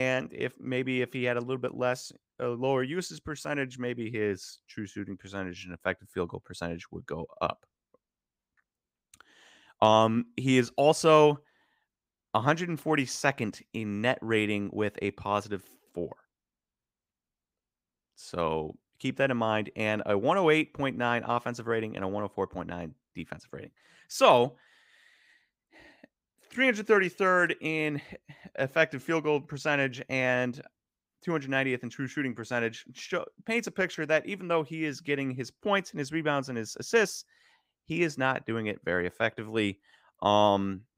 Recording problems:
abrupt cut into speech; at the start

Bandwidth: 15.5 kHz